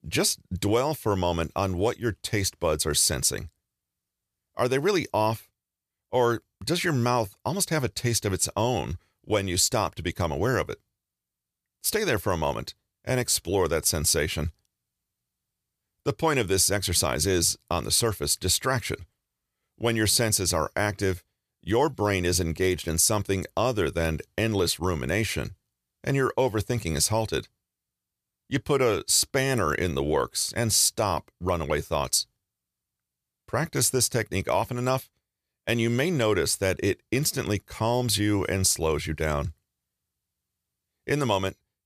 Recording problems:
none

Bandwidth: 14.5 kHz